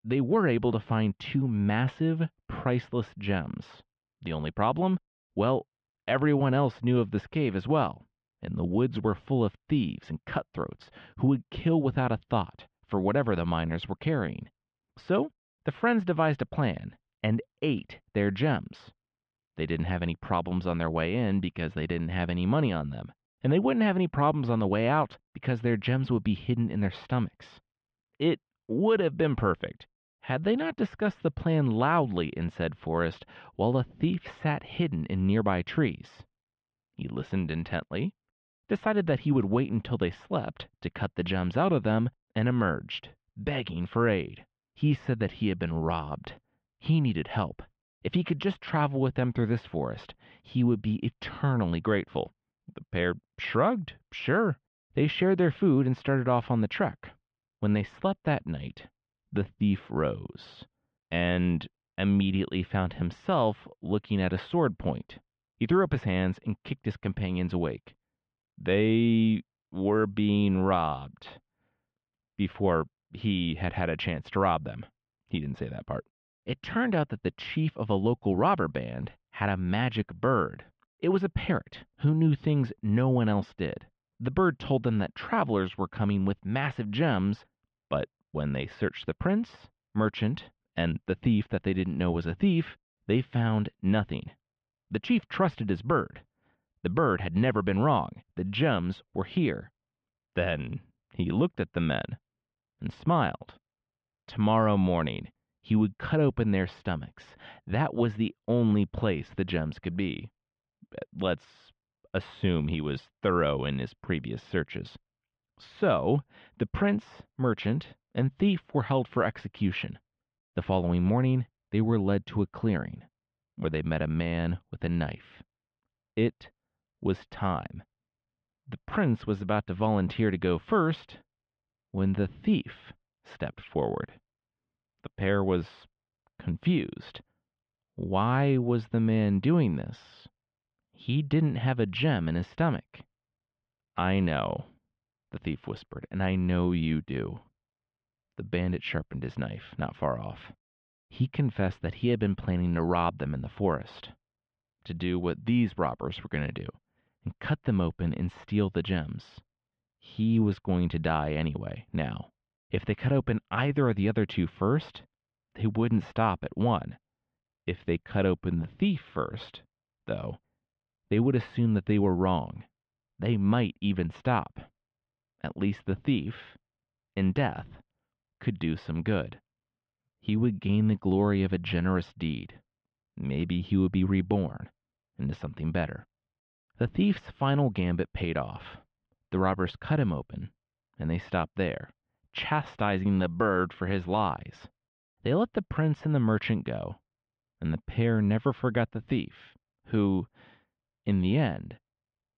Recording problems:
muffled; very; fading above 3 kHz

